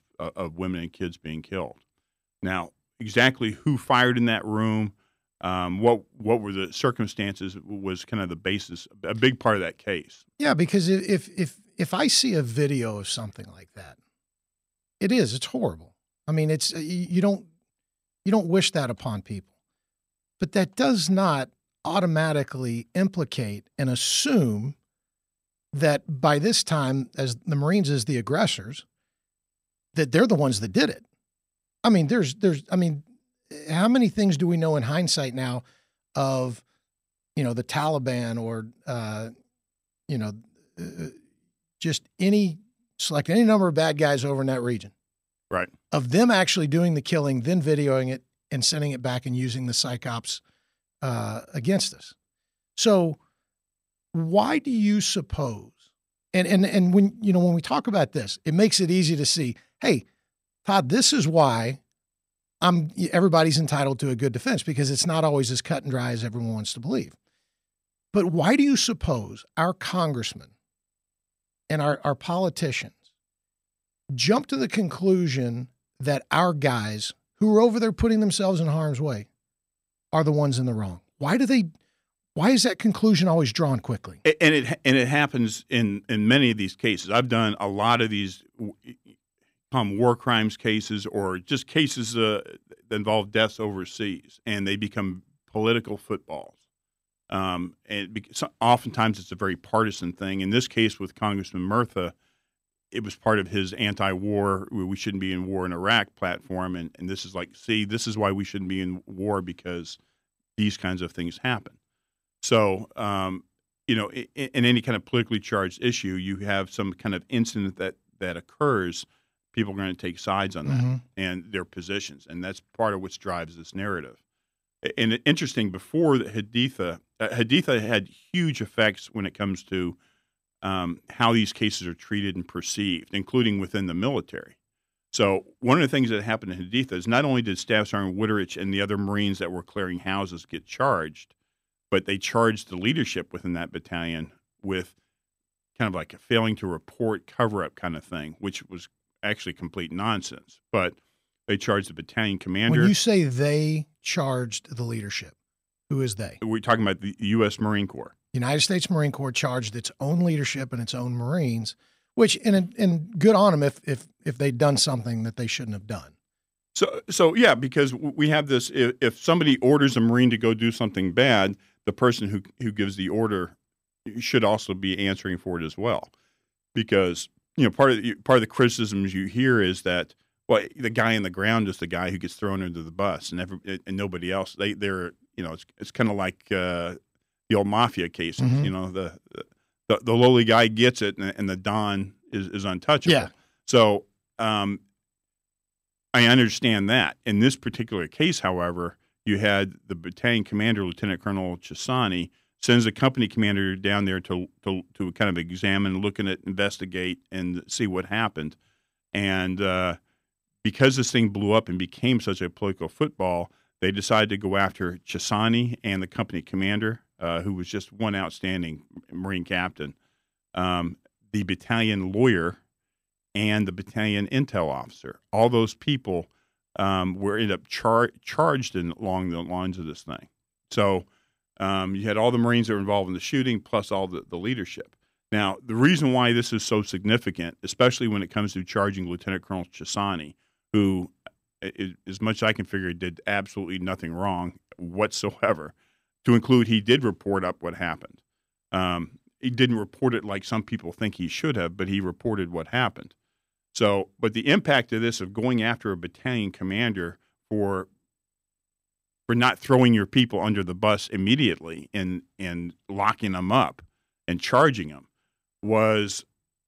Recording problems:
none

